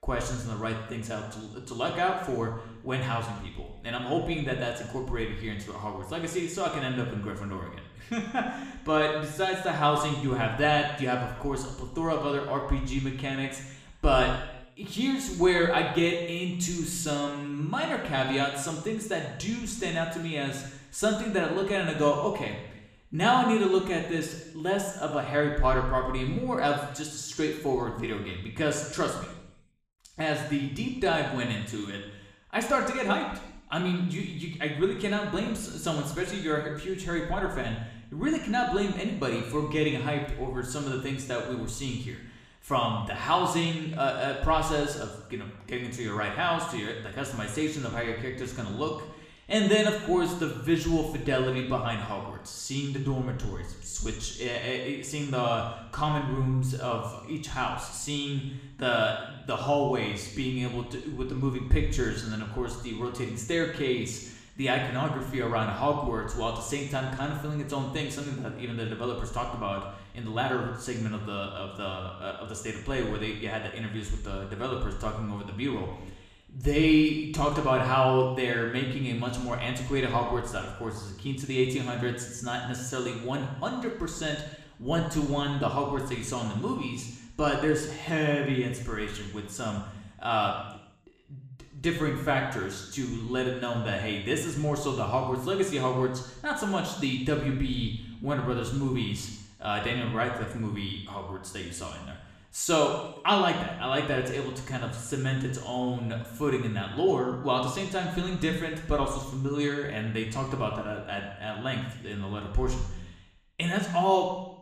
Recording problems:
room echo; noticeable; dies away in 0.9 s
off-mic speech; somewhat distant

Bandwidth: 14.5 kHz